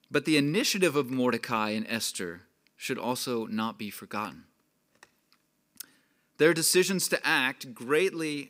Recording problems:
none

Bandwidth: 15.5 kHz